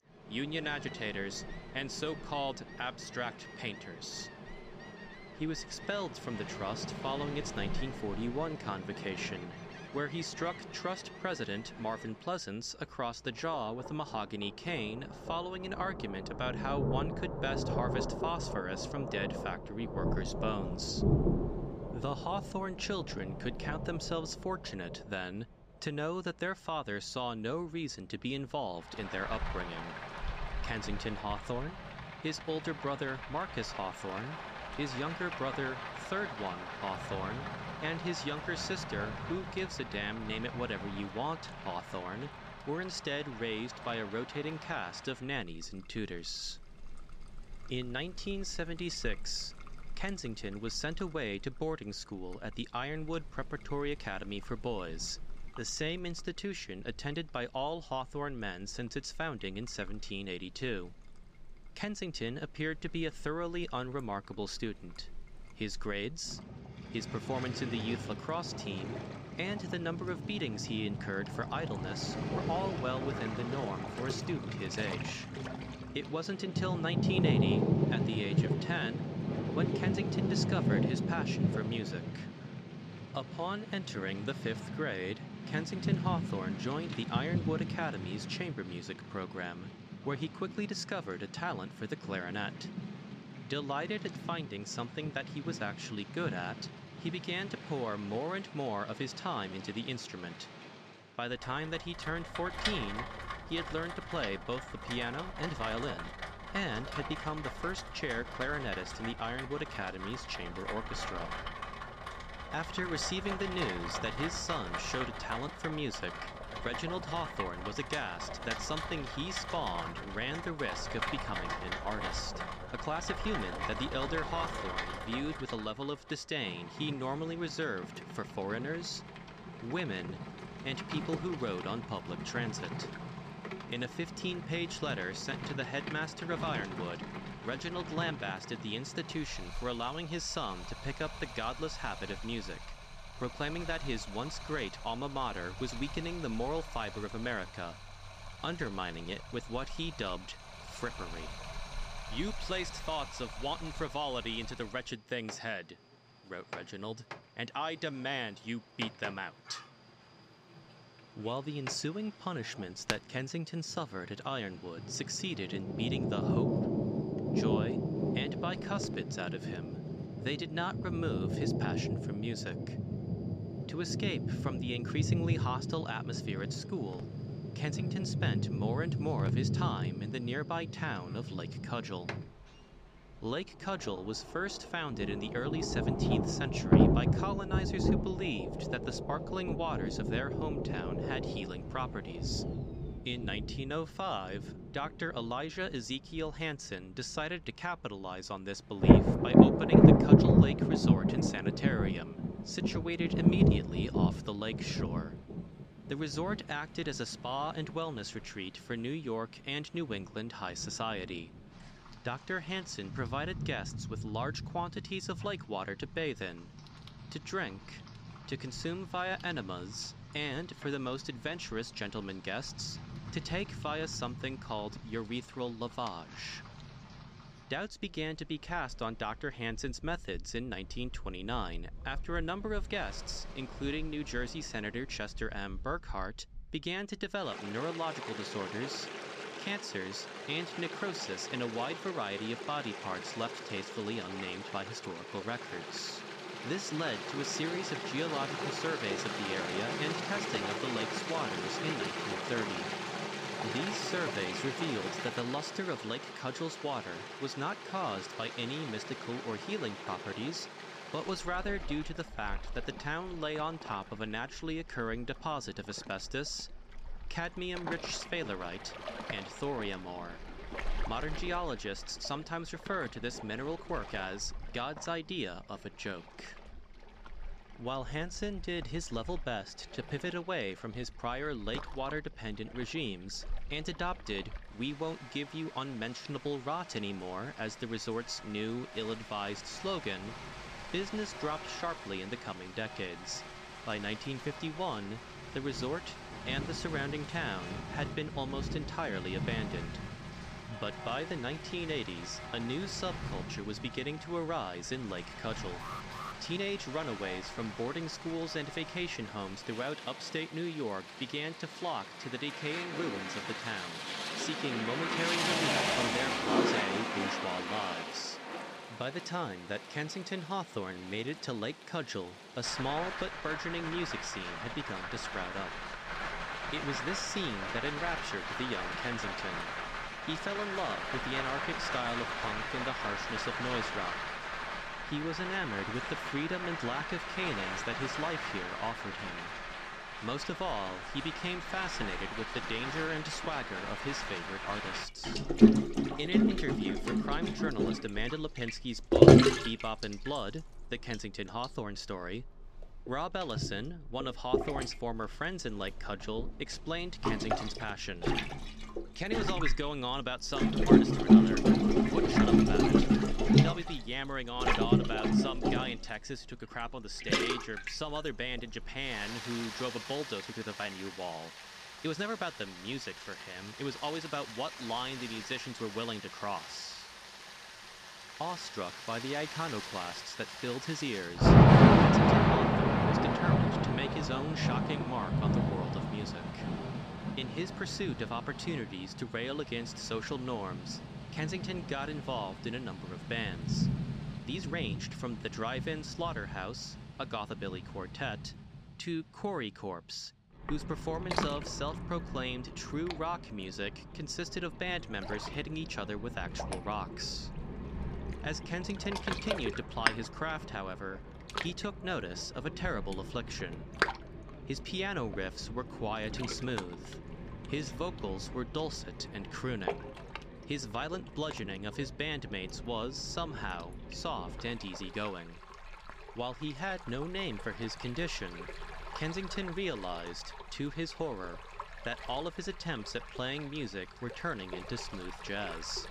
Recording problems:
rain or running water; very loud; throughout; 4 dB above the speech
uneven, jittery; strongly; from 55 s to 6:35
alarm; noticeable; at 5:06; peak 5 dB below the speech

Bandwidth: 15.5 kHz